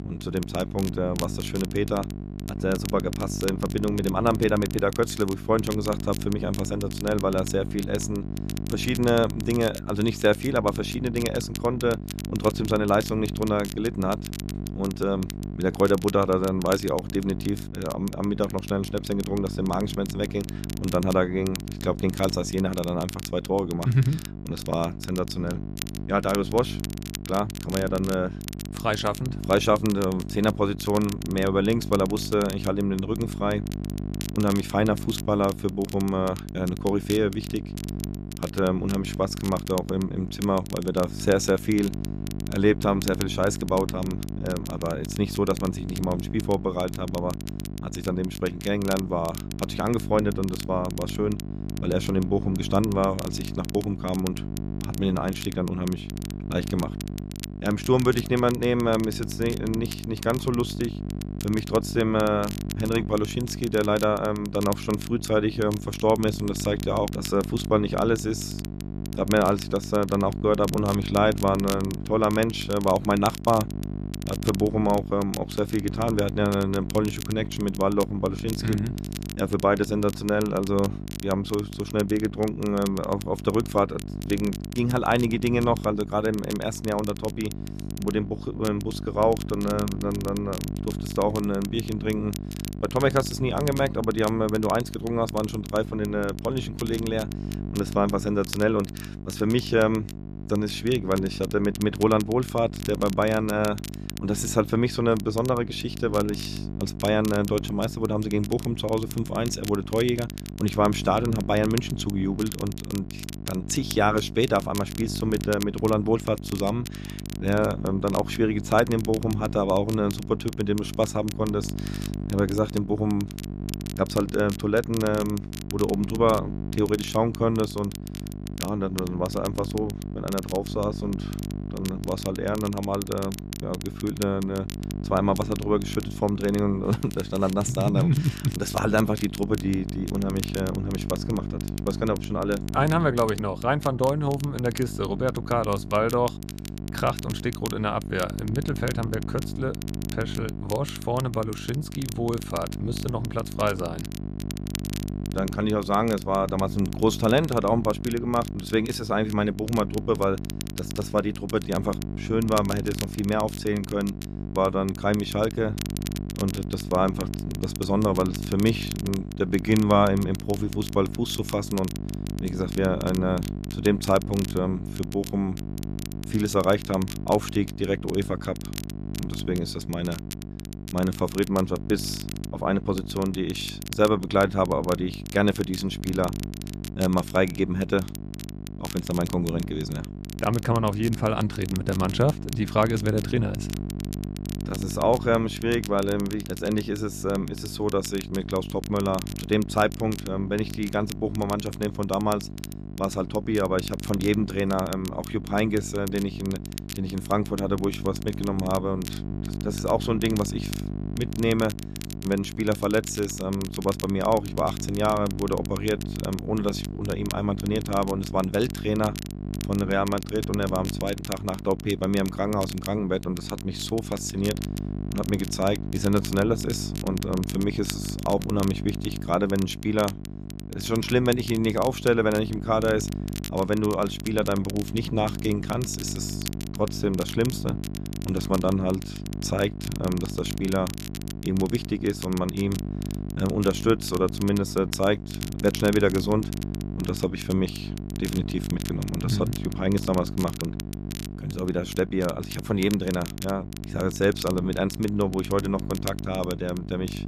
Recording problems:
electrical hum; noticeable; throughout; 50 Hz, 15 dB below the speech
crackle, like an old record; noticeable; 15 dB below the speech

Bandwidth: 14.5 kHz